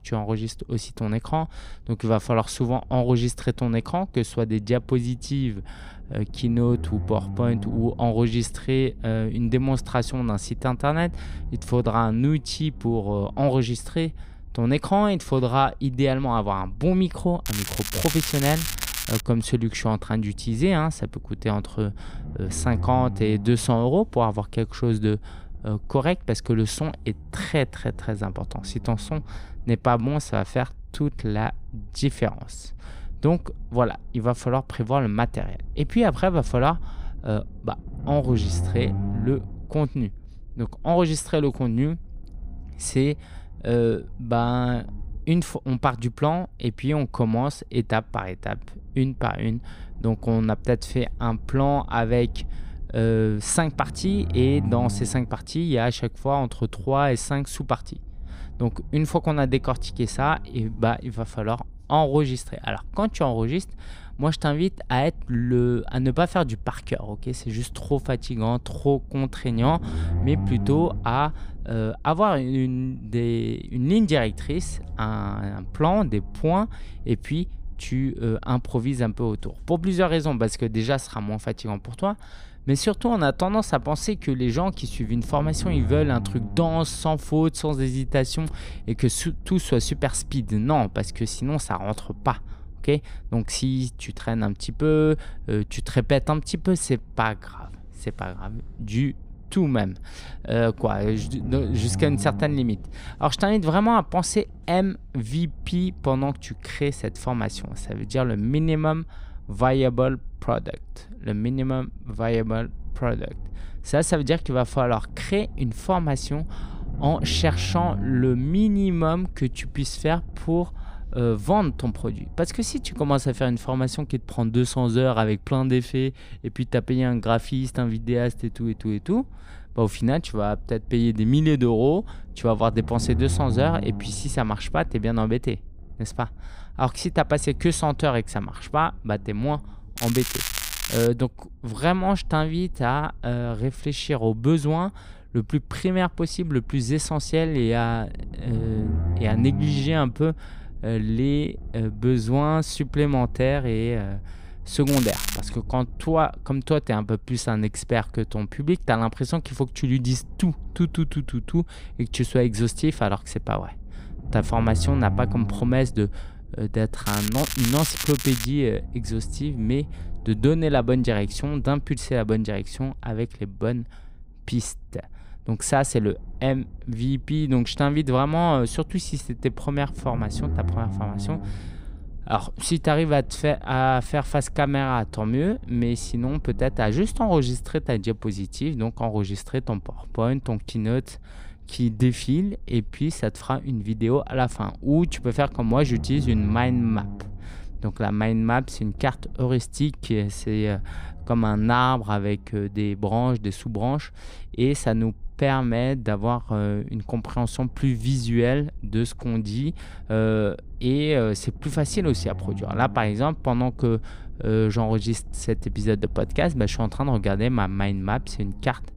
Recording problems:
crackling; loud; 4 times, first at 17 s; 4 dB below the speech
low rumble; faint; throughout; 20 dB below the speech

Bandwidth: 15.5 kHz